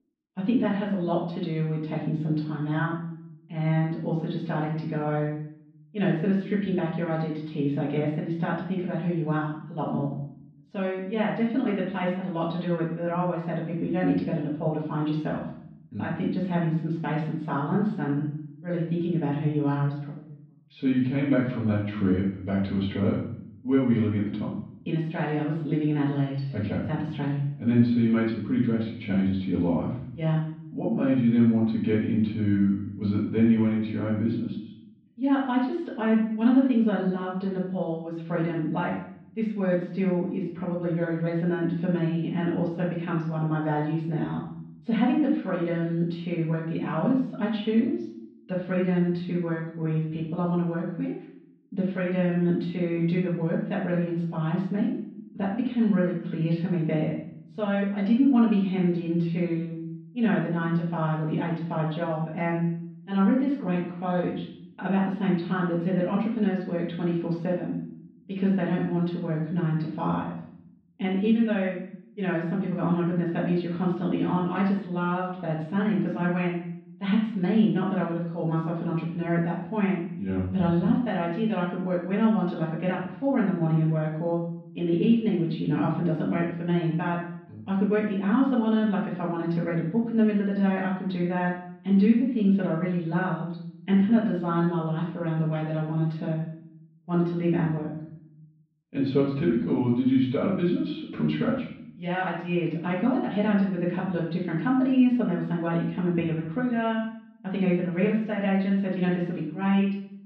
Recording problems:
off-mic speech; far
room echo; noticeable; dies away in 0.7 s
muffled; slightly; fading above 4 kHz

